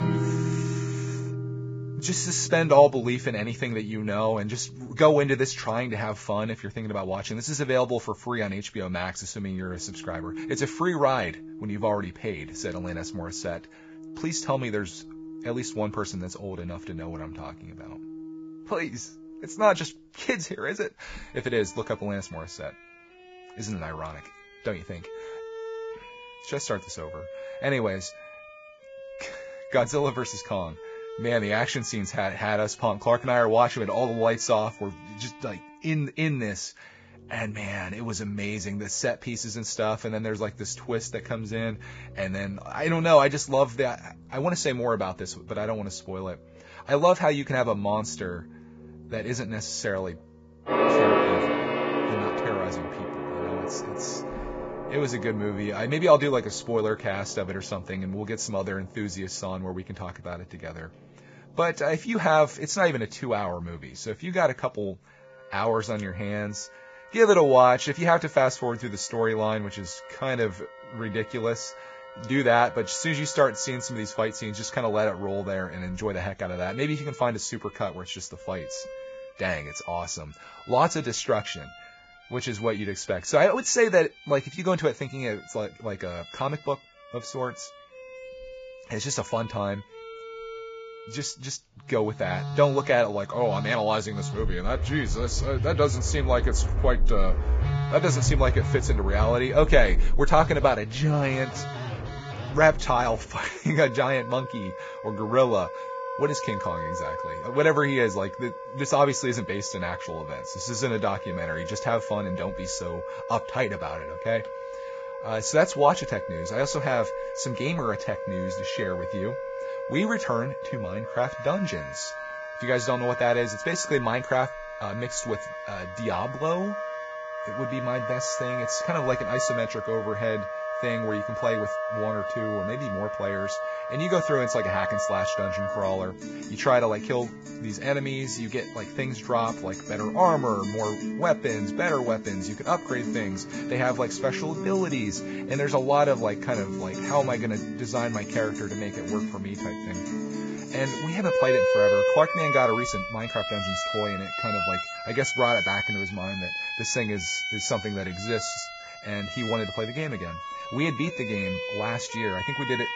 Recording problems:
garbled, watery; badly; nothing above 7.5 kHz
background music; loud; throughout; 5 dB below the speech

